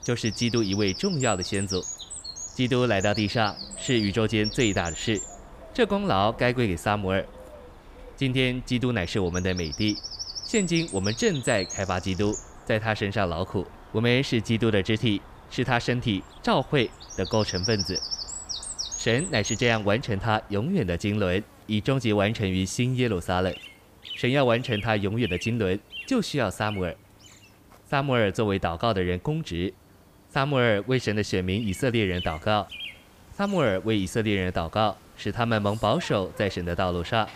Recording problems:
animal sounds; loud; throughout; 10 dB below the speech

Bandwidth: 15 kHz